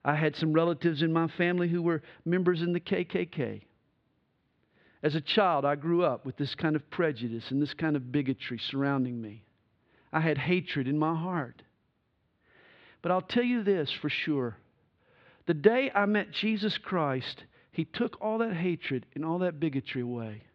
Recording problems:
muffled; slightly; fading above 4 kHz

